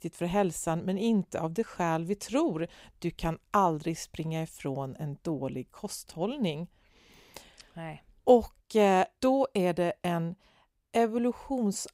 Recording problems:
none

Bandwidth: 15.5 kHz